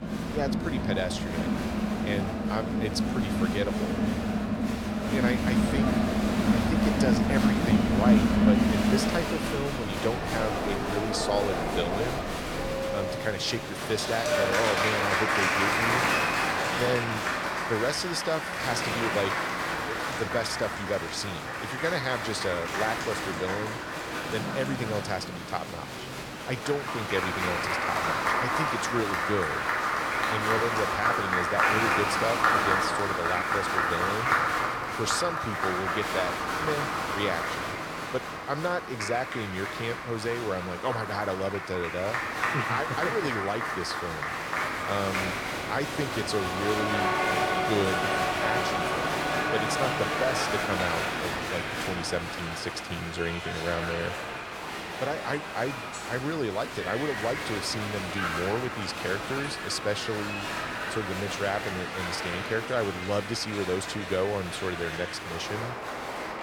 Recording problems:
crowd noise; very loud; throughout; 4 dB above the speech

